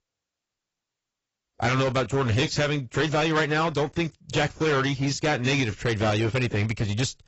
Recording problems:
distortion; heavy; 13% of the sound clipped
garbled, watery; badly; nothing above 8 kHz

